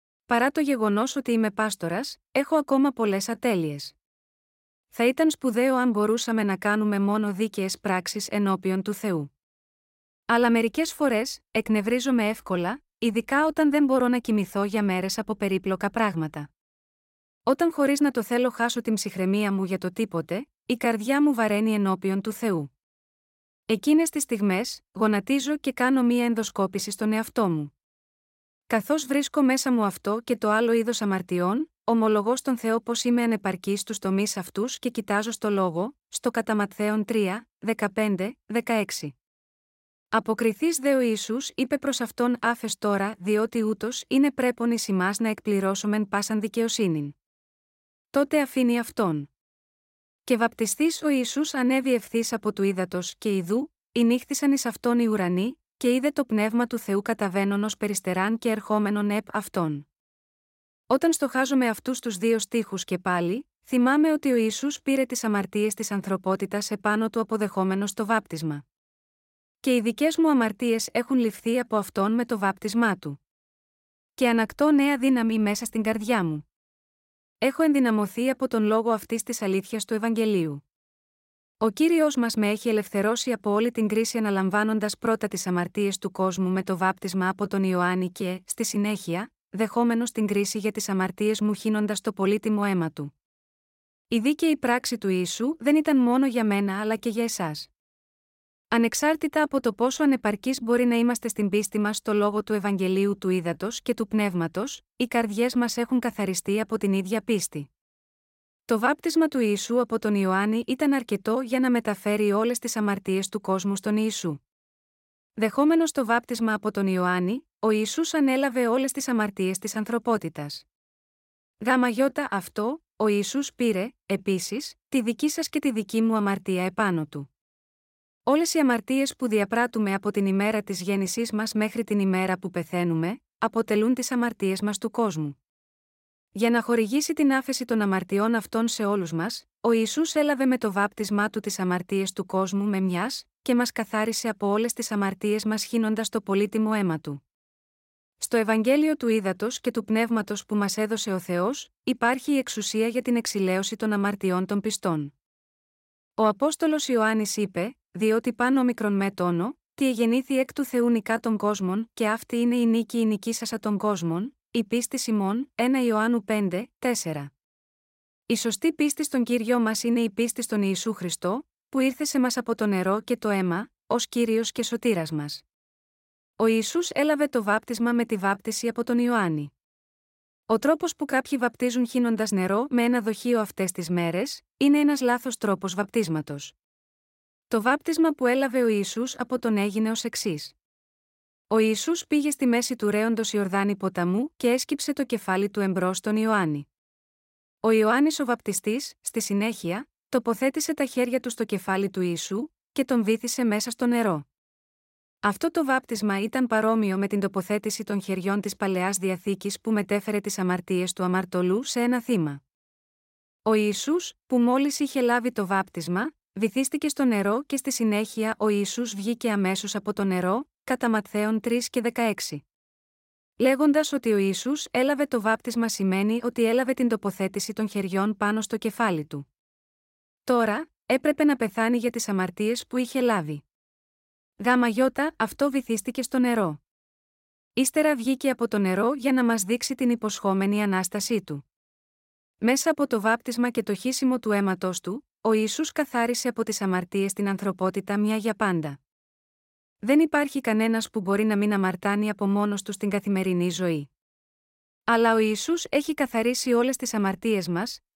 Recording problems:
none

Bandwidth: 16 kHz